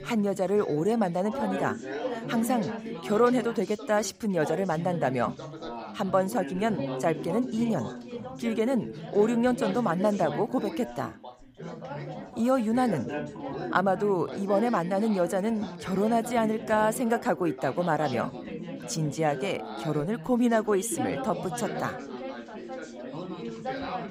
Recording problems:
background chatter; loud; throughout; 4 voices, 9 dB below the speech

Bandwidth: 15.5 kHz